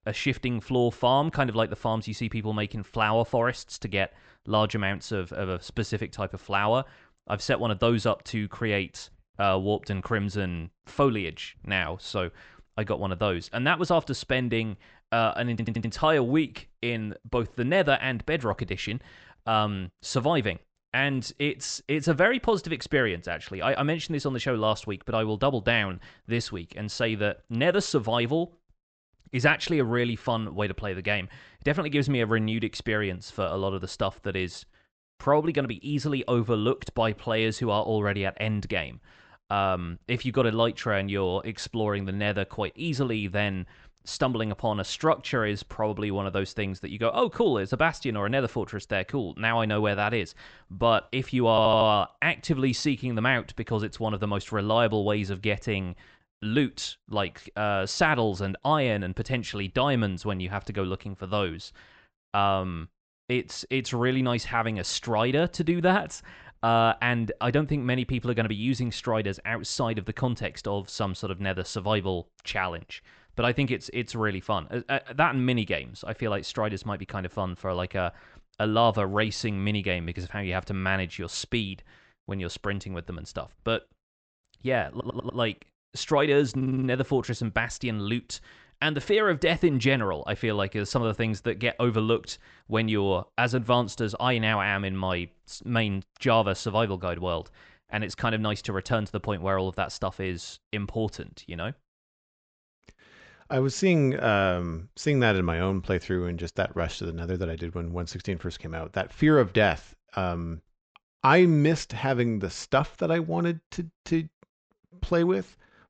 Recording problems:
high frequencies cut off; noticeable; nothing above 8 kHz
audio stuttering; 4 times, first at 16 s

